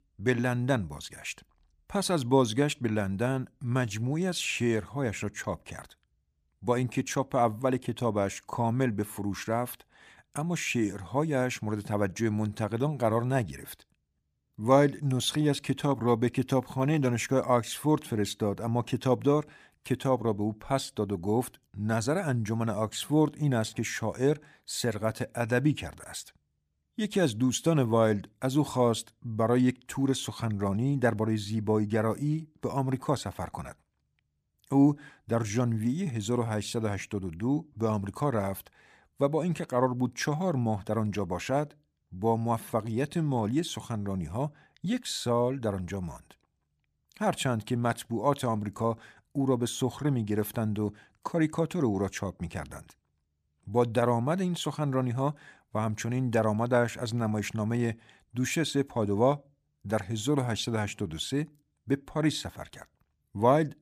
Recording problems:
none

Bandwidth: 15 kHz